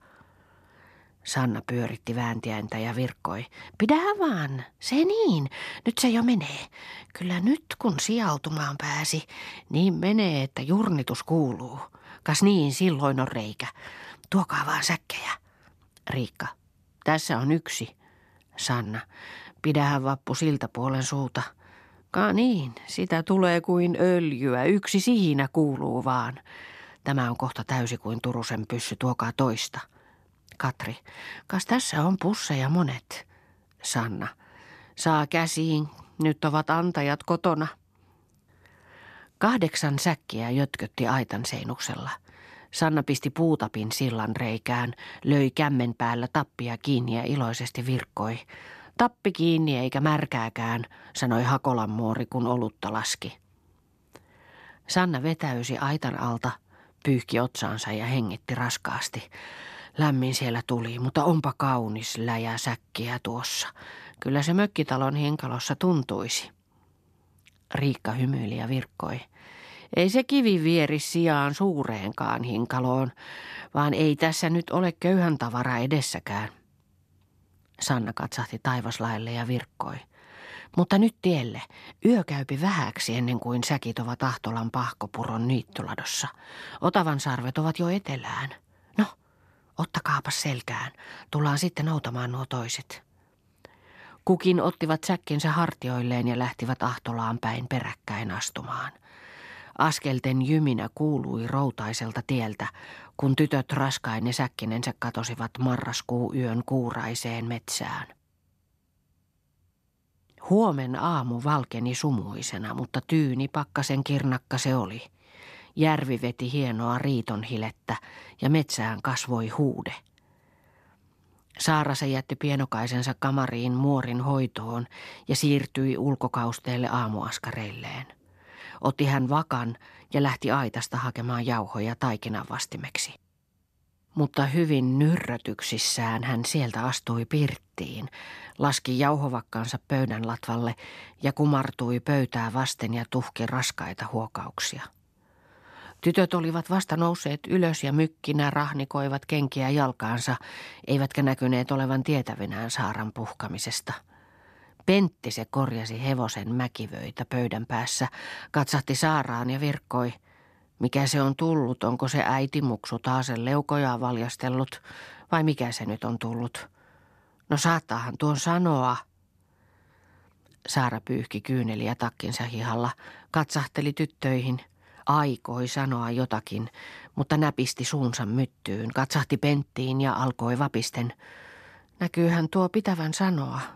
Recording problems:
none

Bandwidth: 14 kHz